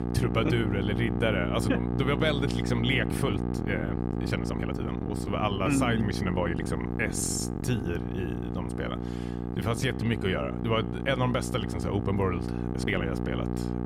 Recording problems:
electrical hum; loud; throughout; 60 Hz, 6 dB below the speech
uneven, jittery; strongly; from 3 to 13 s

